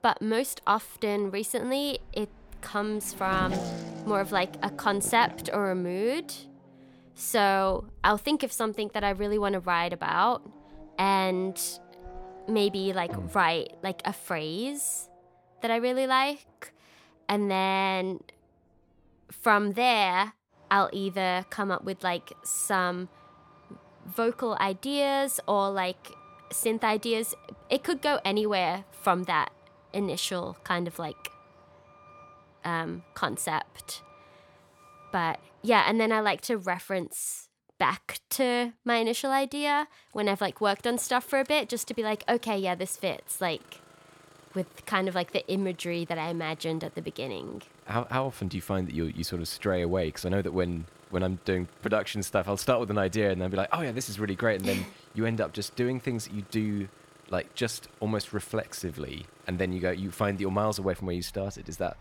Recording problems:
traffic noise; faint; throughout; 20 dB below the speech

